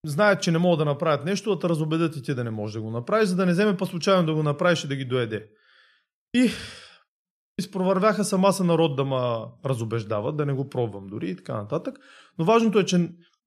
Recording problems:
none

